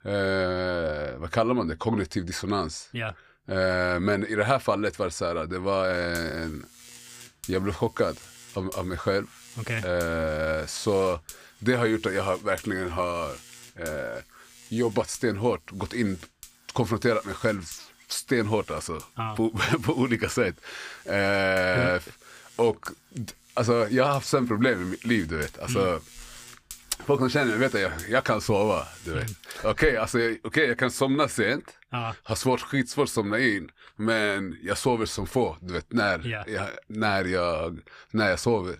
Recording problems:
electrical hum; faint; from 6 to 30 s; 50 Hz, 20 dB below the speech

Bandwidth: 15 kHz